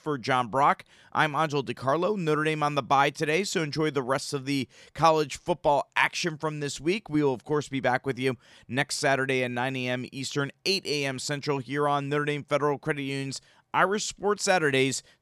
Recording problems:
none

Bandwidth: 14.5 kHz